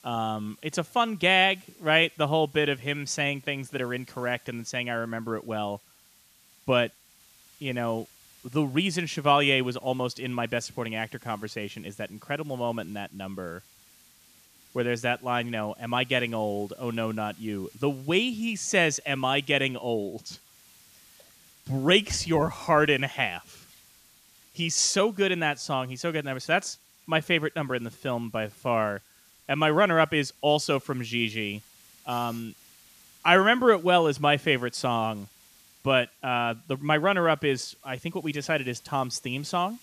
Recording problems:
hiss; faint; throughout; 30 dB below the speech

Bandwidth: 14.5 kHz